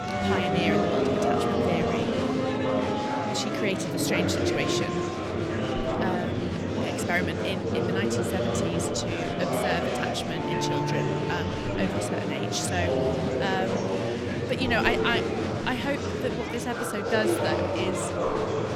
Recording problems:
murmuring crowd; very loud; throughout; 3 dB above the speech
background music; loud; throughout; 2 dB below the speech

